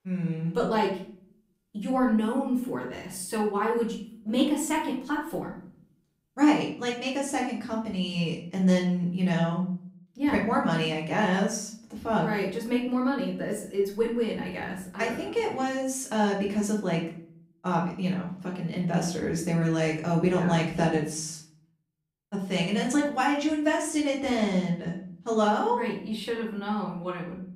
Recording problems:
off-mic speech; far
room echo; slight; dies away in 0.5 s

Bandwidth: 15.5 kHz